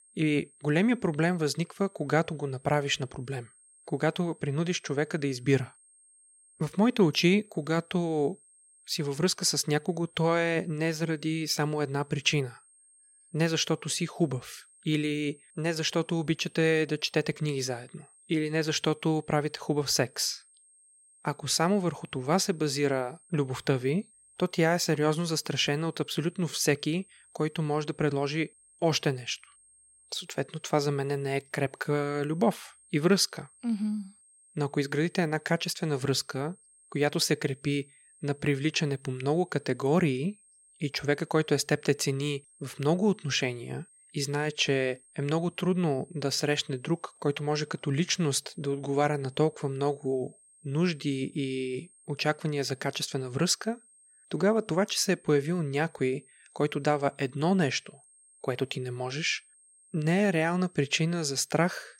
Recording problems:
high-pitched whine; faint; throughout; 8.5 kHz, 30 dB below the speech

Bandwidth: 16 kHz